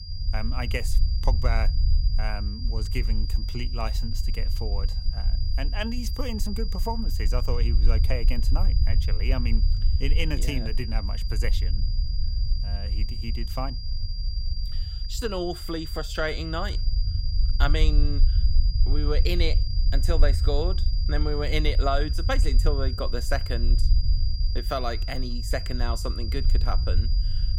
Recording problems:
high-pitched whine; loud; throughout; 5 kHz, 6 dB below the speech
low rumble; noticeable; throughout; 15 dB below the speech

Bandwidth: 16 kHz